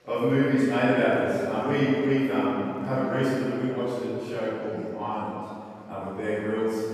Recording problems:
room echo; strong; dies away in 2.4 s
off-mic speech; far
chatter from many people; faint; throughout; 30 dB below the speech

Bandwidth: 14.5 kHz